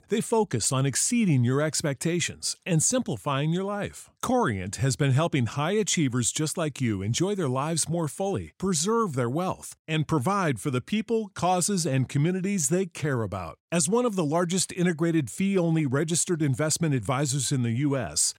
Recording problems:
none

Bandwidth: 16 kHz